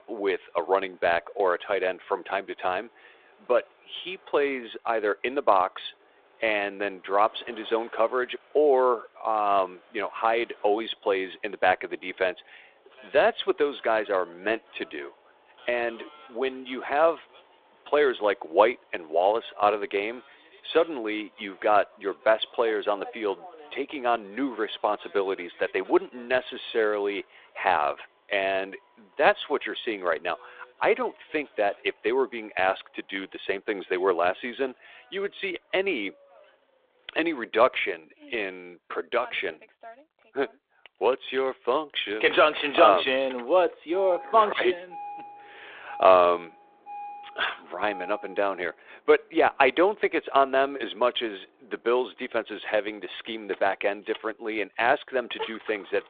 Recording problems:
phone-call audio; nothing above 3.5 kHz
traffic noise; faint; throughout; 20 dB below the speech

